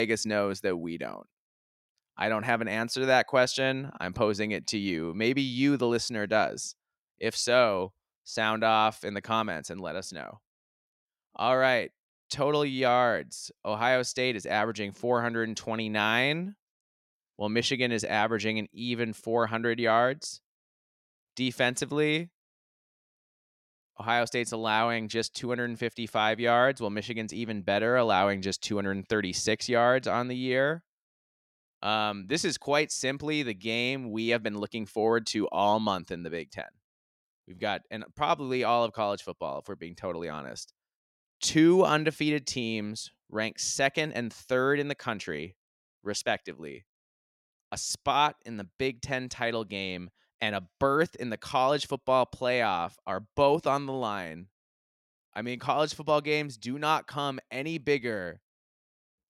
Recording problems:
abrupt cut into speech; at the start

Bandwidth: 16 kHz